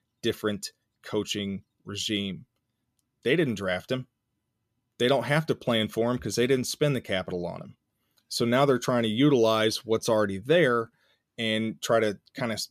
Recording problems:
none

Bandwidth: 14.5 kHz